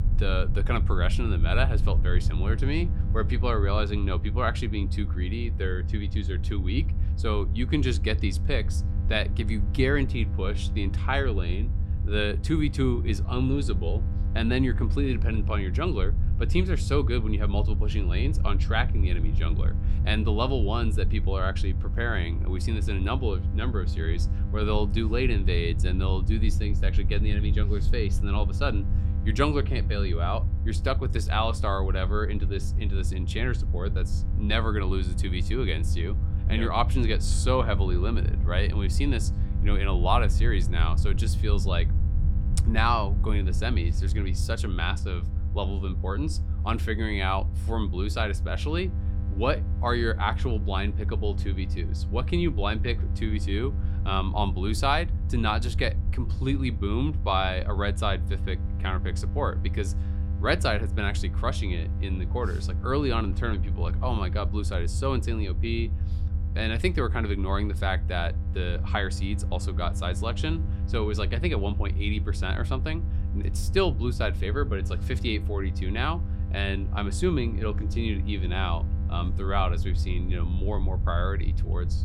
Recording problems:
electrical hum; noticeable; throughout; 50 Hz, 15 dB below the speech
low rumble; noticeable; throughout; 15 dB below the speech

